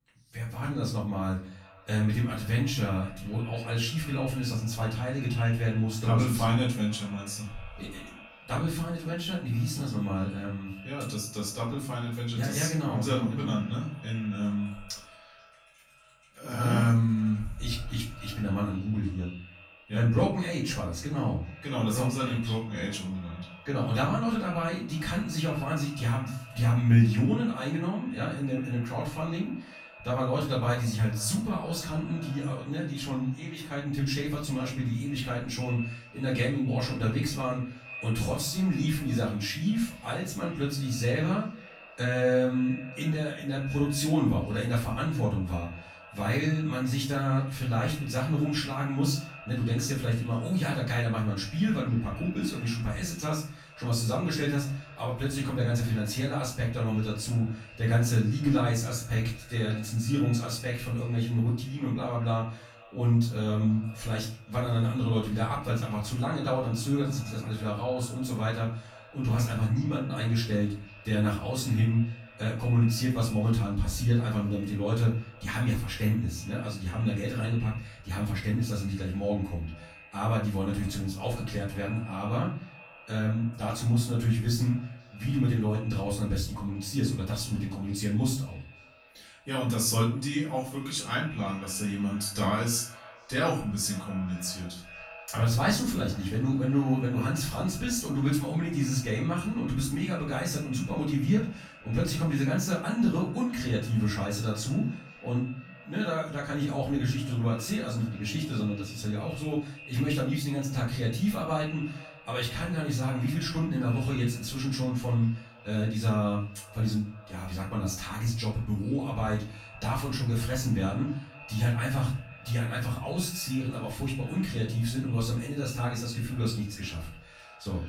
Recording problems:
off-mic speech; far
echo of what is said; faint; throughout; 480 ms later, 20 dB below the speech
room echo; slight; dies away in 0.4 s

